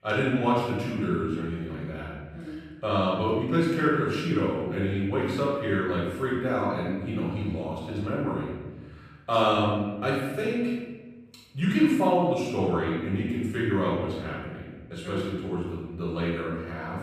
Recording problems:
room echo; strong; dies away in 1.3 s
off-mic speech; far

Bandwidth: 14.5 kHz